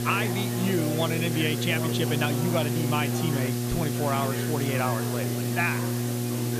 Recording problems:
electrical hum; loud; throughout; 60 Hz, 6 dB below the speech
chatter from many people; loud; throughout; 8 dB below the speech
hiss; loud; throughout; 6 dB below the speech

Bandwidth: 14.5 kHz